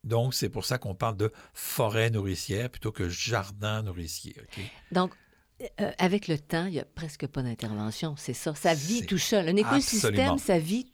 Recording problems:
none

